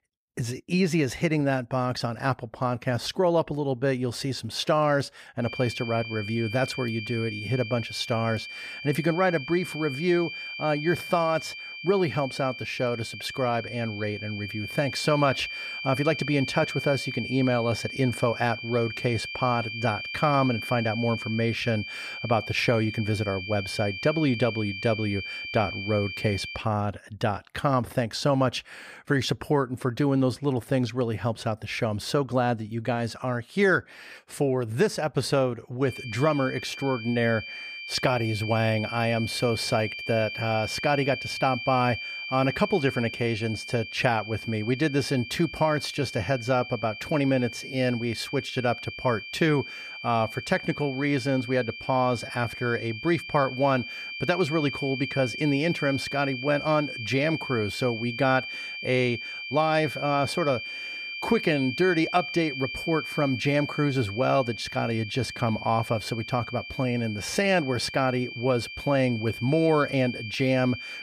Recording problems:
high-pitched whine; loud; from 5.5 to 27 s and from 36 s on; 2.5 kHz, 8 dB below the speech

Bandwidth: 15 kHz